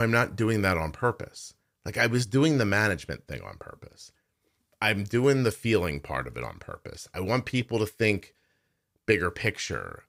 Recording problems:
abrupt cut into speech; at the start

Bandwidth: 15.5 kHz